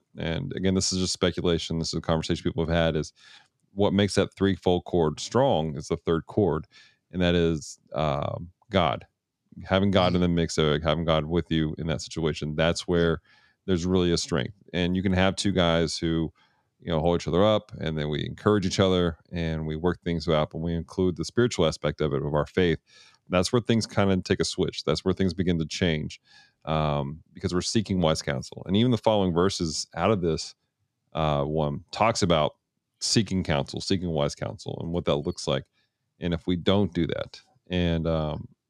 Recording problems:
none

